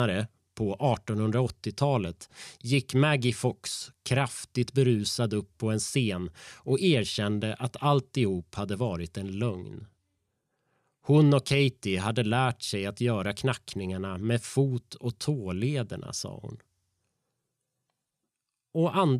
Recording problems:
abrupt cut into speech; at the start and the end

